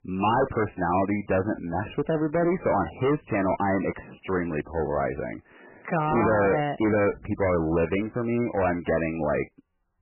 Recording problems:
distortion; heavy; 17% of the sound clipped
garbled, watery; badly; nothing above 3 kHz

